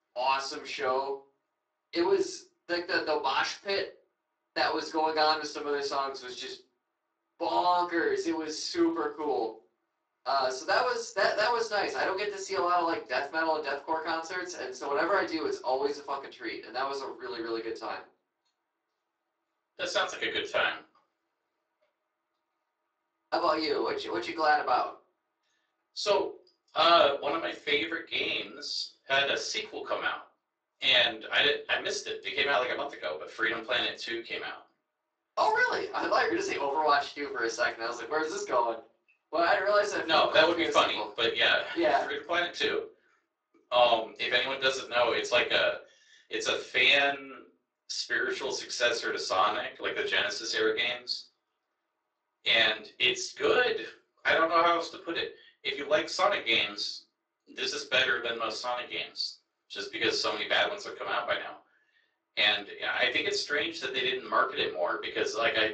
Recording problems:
off-mic speech; far
thin; very; fading below 350 Hz
room echo; slight; dies away in 0.3 s
garbled, watery; slightly
uneven, jittery; slightly; from 3.5 to 58 s

